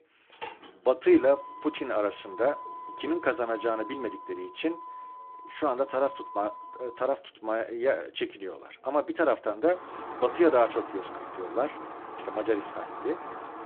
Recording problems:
phone-call audio
traffic noise; noticeable; throughout; 15 dB below the speech

